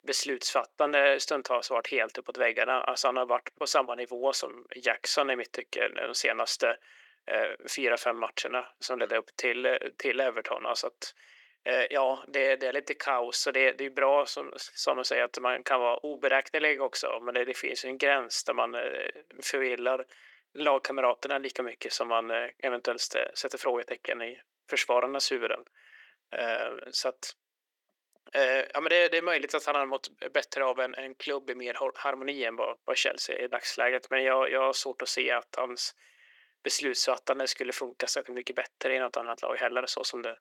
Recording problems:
thin; very; fading below 400 Hz

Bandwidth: 18.5 kHz